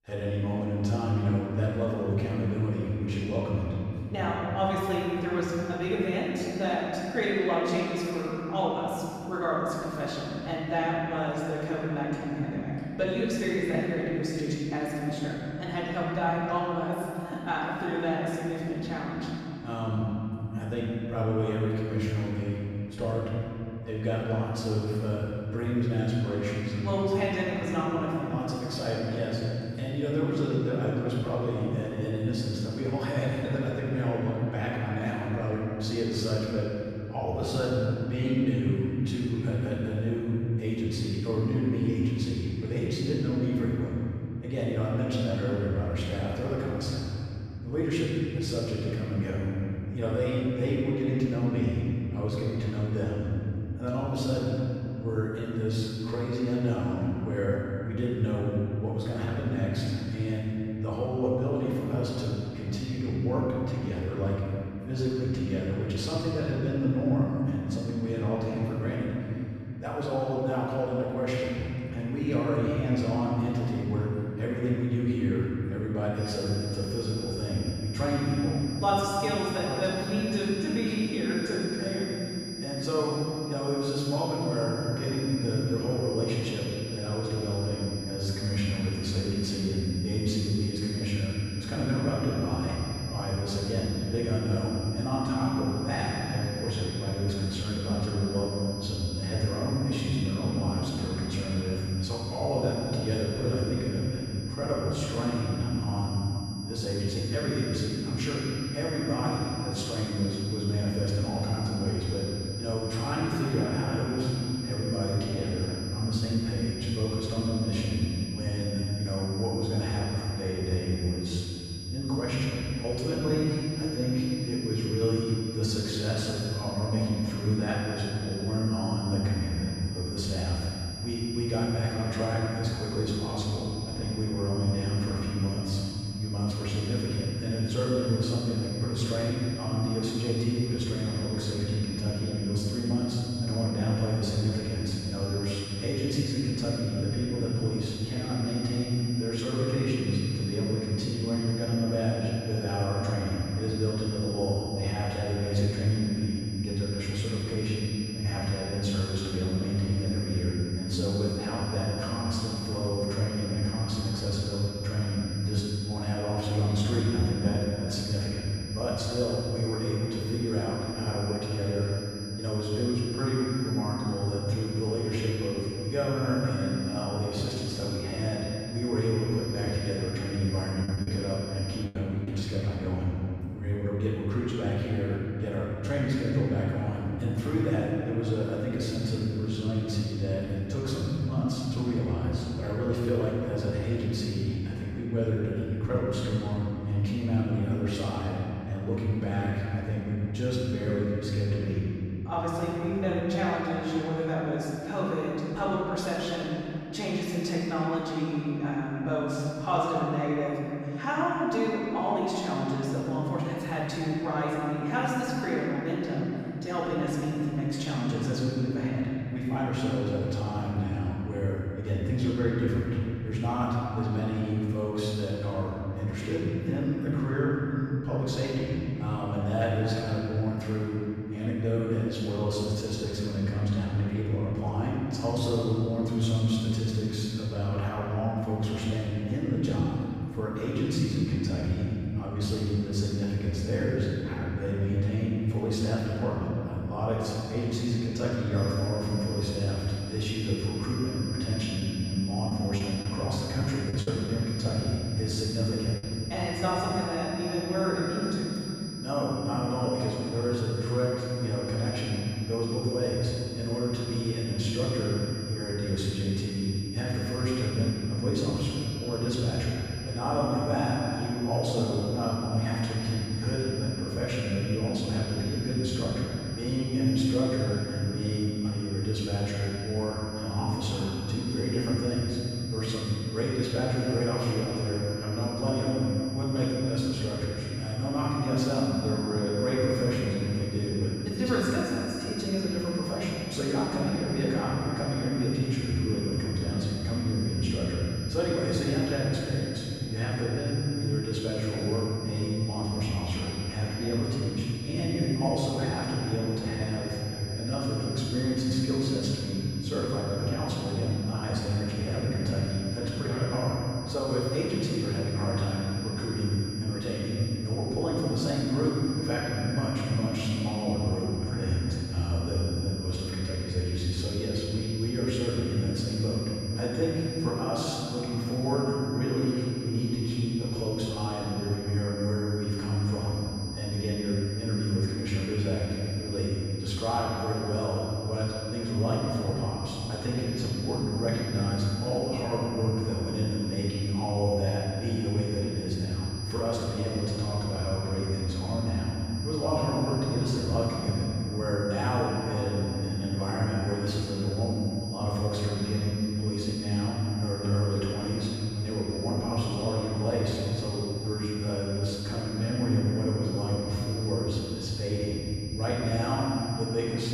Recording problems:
room echo; strong; dies away in 3 s
off-mic speech; far
high-pitched whine; noticeable; from 1:16 to 3:02 and from 4:09 on; 5 kHz, 10 dB below the speech
choppy; very; from 3:01 to 3:02 and from 4:12 to 4:16; 7% of the speech affected

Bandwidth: 15.5 kHz